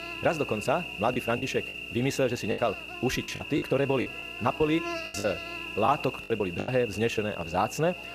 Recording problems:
wrong speed, natural pitch; too fast; 1.5 times normal speed
electrical hum; loud; throughout; 60 Hz, 6 dB below the speech
voice in the background; faint; throughout; 25 dB below the speech
choppy; very; 10% of the speech affected

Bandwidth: 14.5 kHz